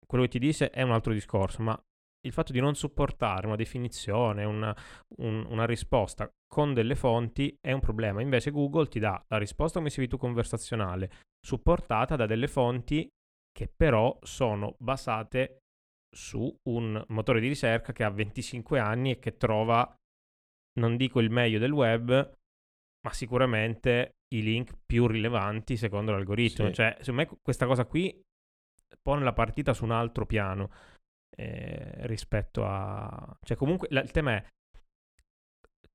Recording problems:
none

